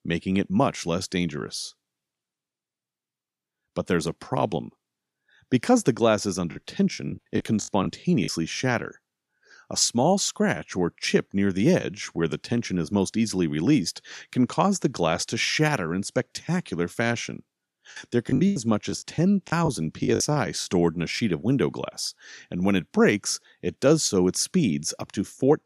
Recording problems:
choppy; very; from 6.5 to 8.5 s and from 18 to 21 s; 17% of the speech affected

